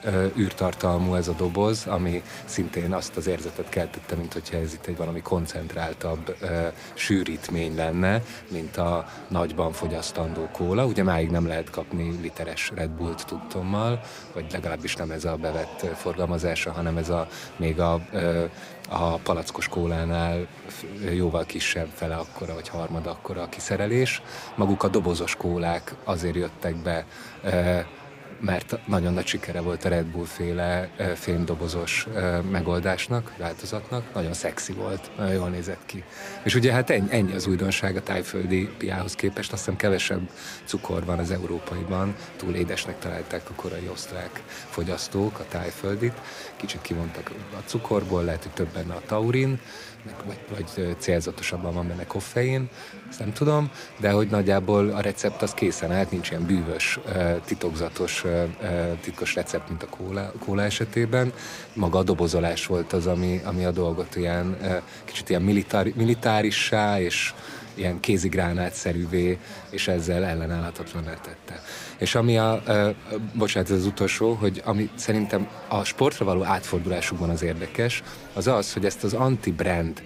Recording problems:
chatter from many people; noticeable; throughout; 15 dB below the speech

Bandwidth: 15.5 kHz